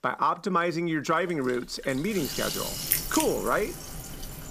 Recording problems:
household noises; loud; throughout; 3 dB below the speech

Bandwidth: 15 kHz